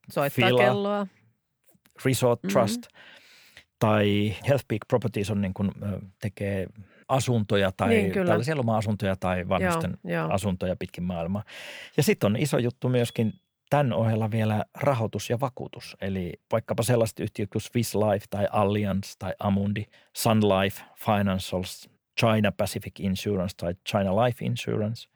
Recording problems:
none

